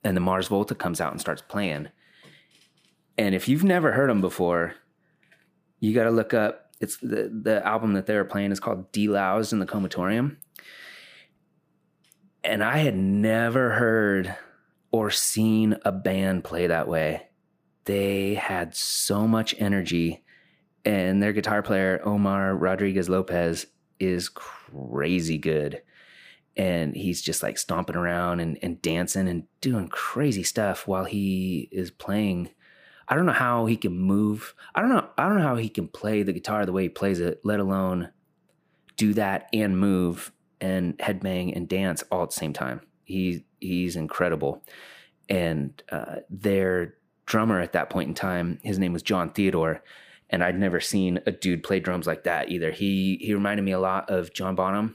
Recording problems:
none

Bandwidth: 15 kHz